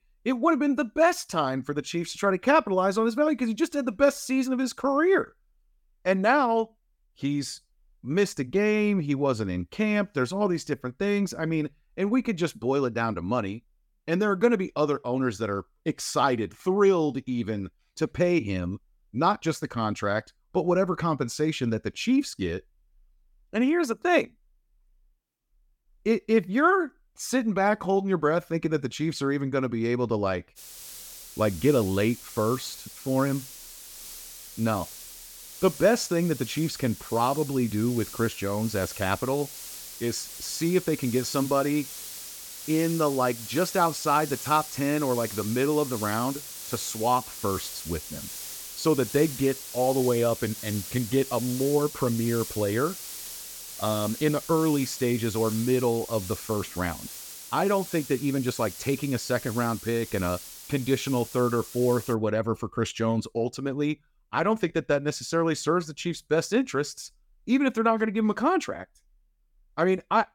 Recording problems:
hiss; noticeable; from 31 s to 1:02; 10 dB below the speech

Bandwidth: 17 kHz